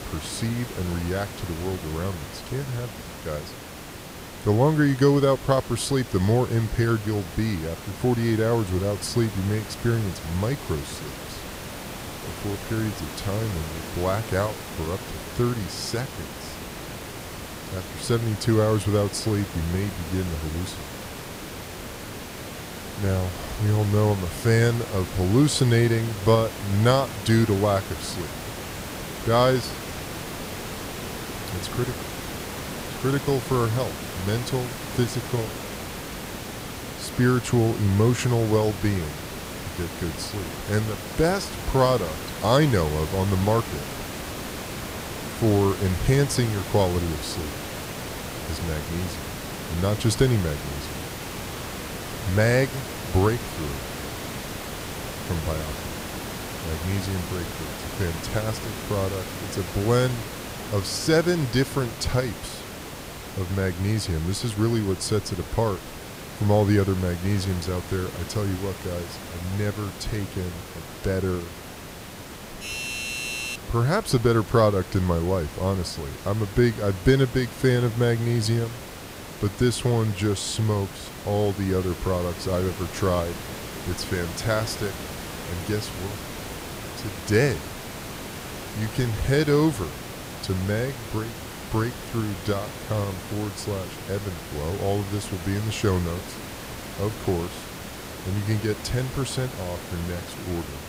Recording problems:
hiss; loud; throughout; 9 dB below the speech
doorbell; noticeable; from 1:13 to 1:14; peak 3 dB below the speech

